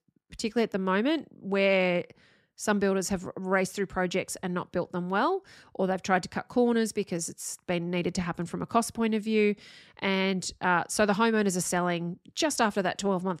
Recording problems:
none

